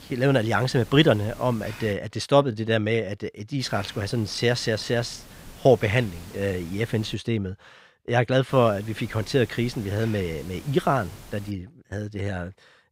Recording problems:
hiss; noticeable; until 2 s, from 3.5 to 7 s and from 8.5 to 12 s; 20 dB below the speech

